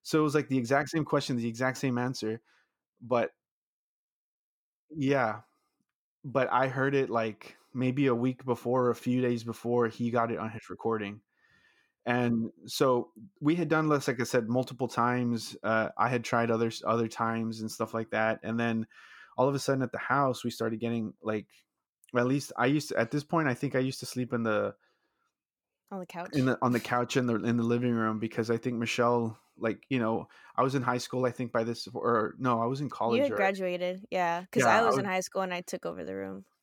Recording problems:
none

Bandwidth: 18 kHz